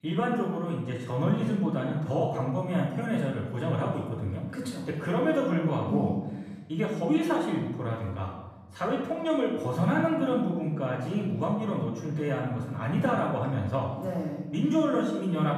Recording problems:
off-mic speech; far
room echo; noticeable; dies away in 1 s

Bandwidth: 14.5 kHz